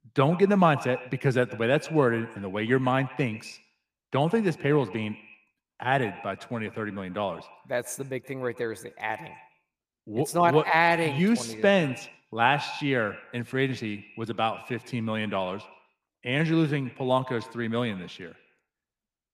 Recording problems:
echo of what is said; noticeable; throughout; 120 ms later, 15 dB below the speech

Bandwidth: 15 kHz